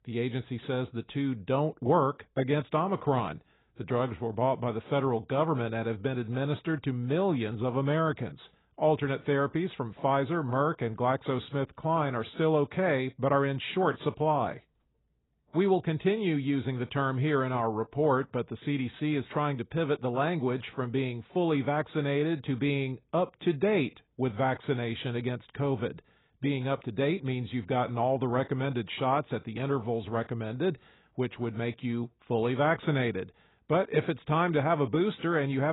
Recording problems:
garbled, watery; badly; nothing above 4 kHz
abrupt cut into speech; at the end

